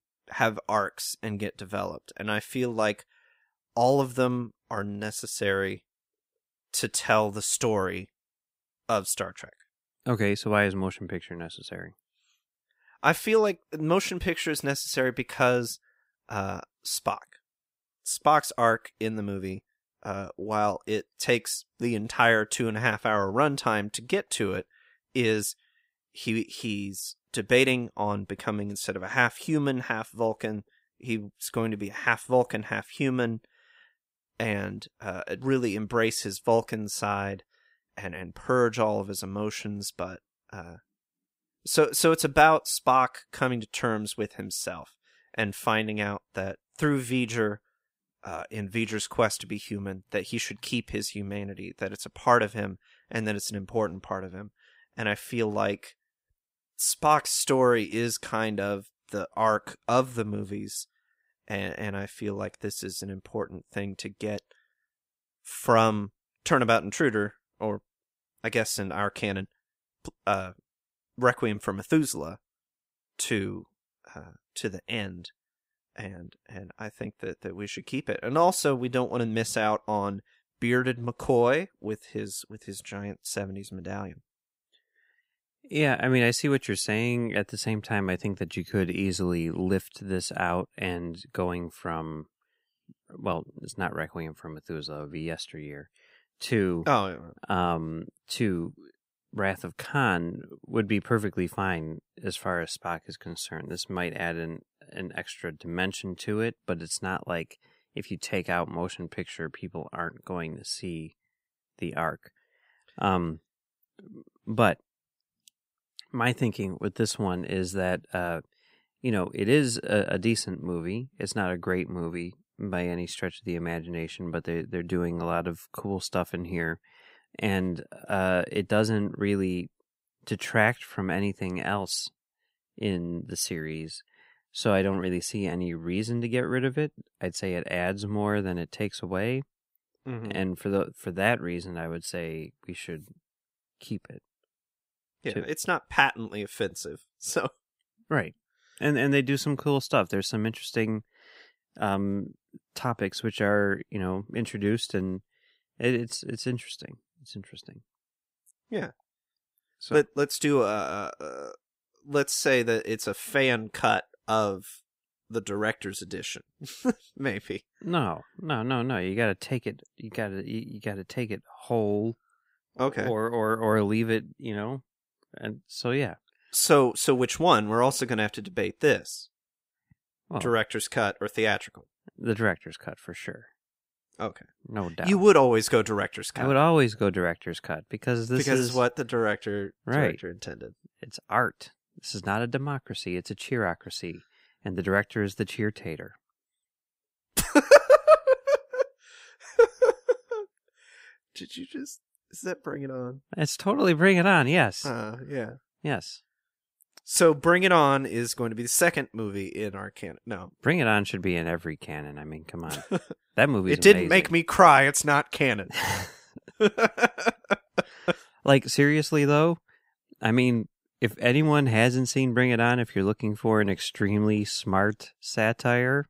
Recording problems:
none

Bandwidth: 15.5 kHz